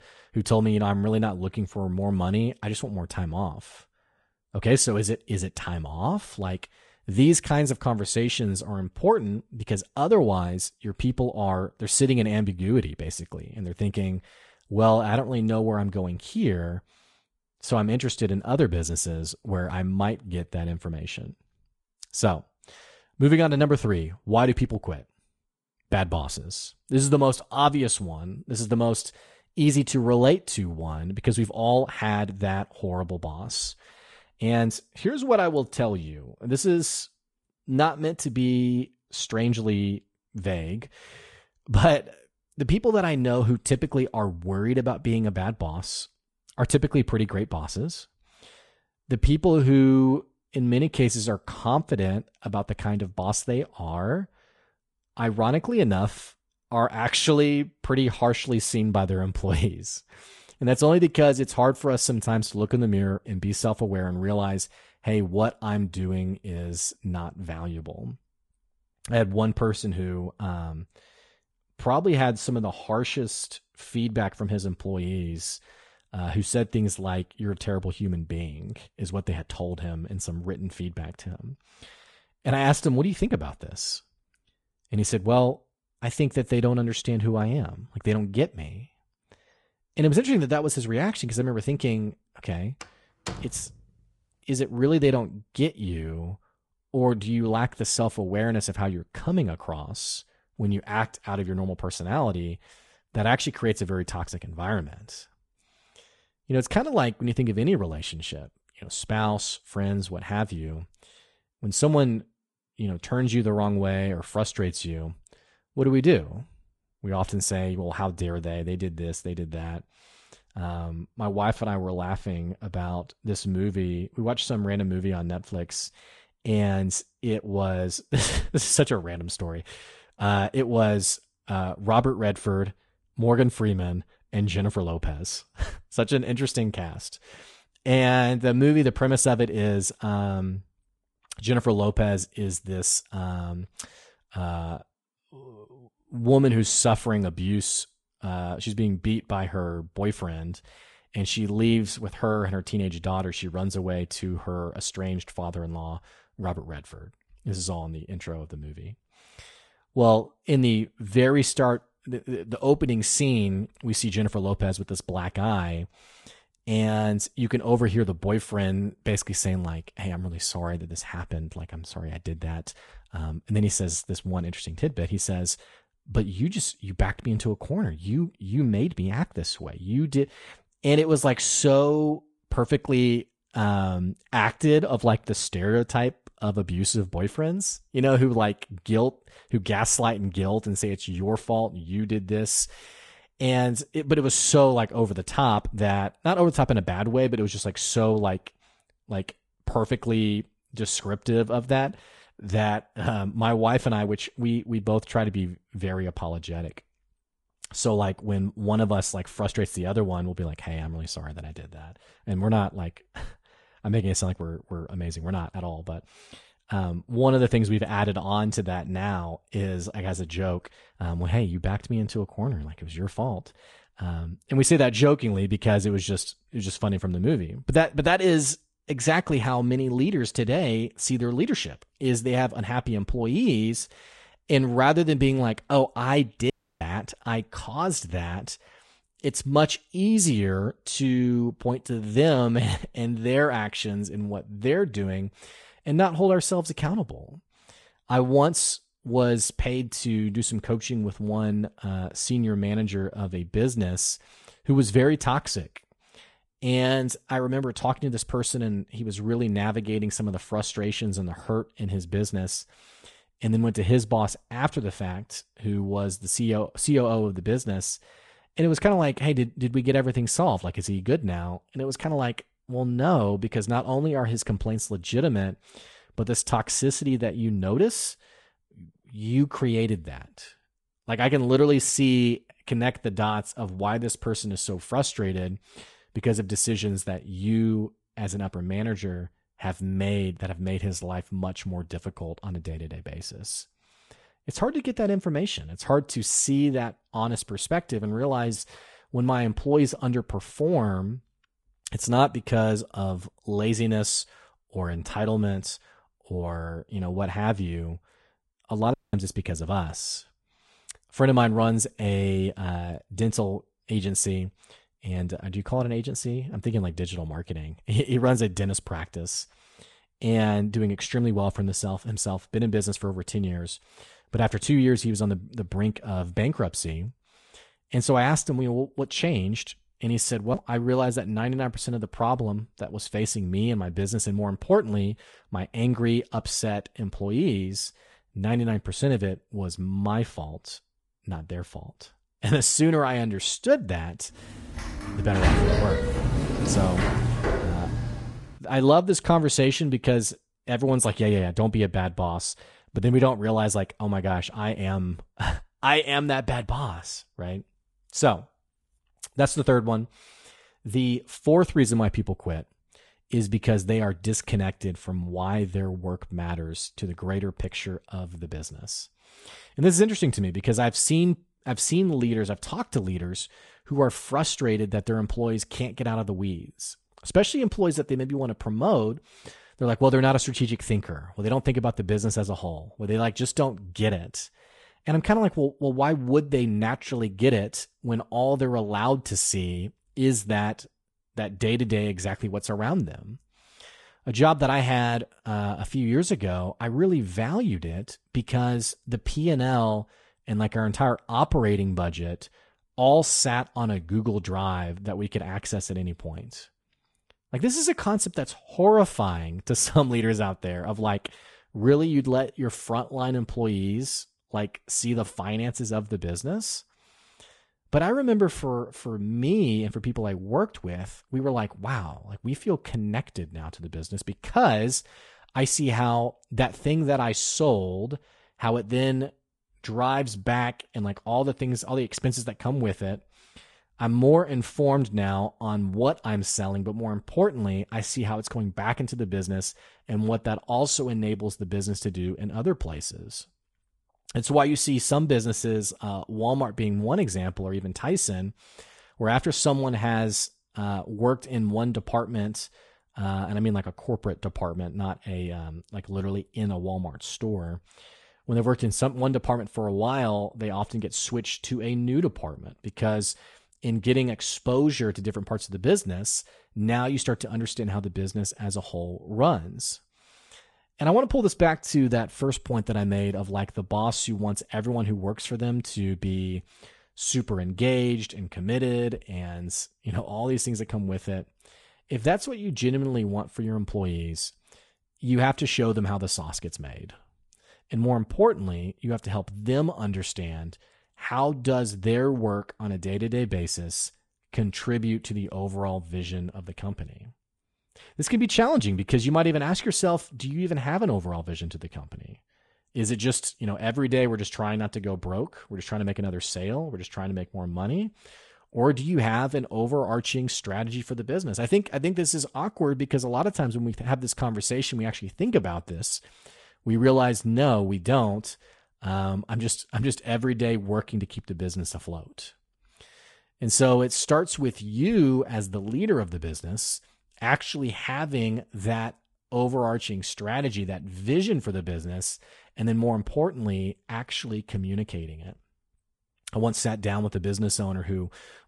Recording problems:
garbled, watery; slightly
door banging; faint; at 1:33; peak 10 dB below the speech
audio cutting out; at 3:57 and at 5:09
door banging; loud; from 5:45 to 5:48; peak 5 dB above the speech

